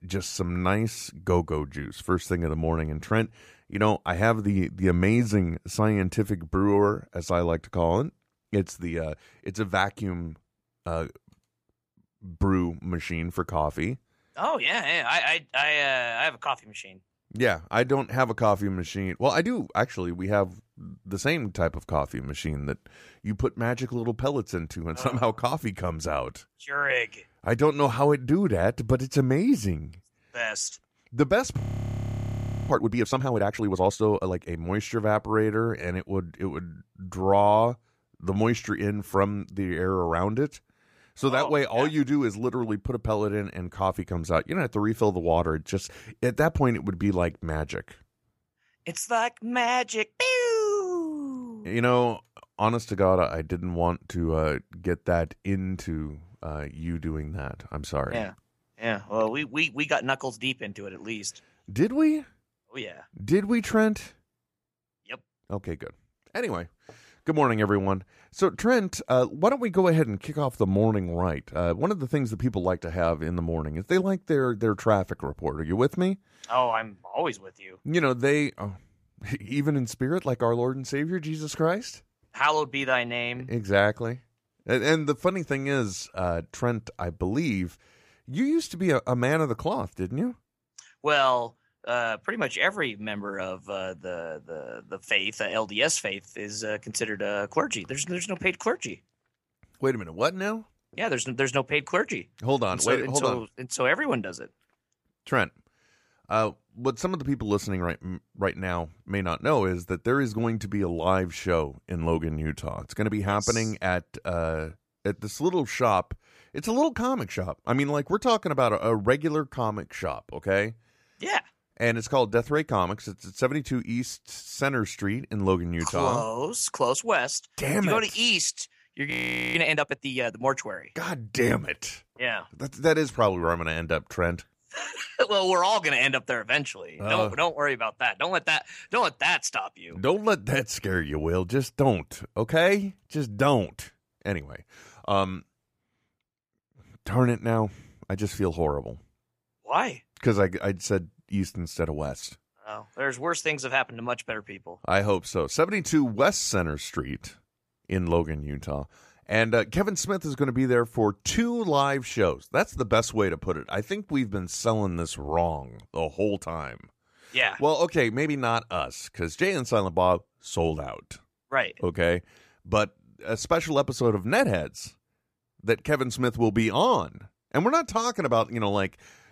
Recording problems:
audio freezing; at 32 s for 1 s and at 2:09

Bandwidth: 15 kHz